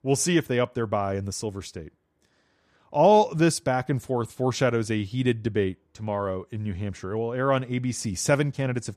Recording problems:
none

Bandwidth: 14.5 kHz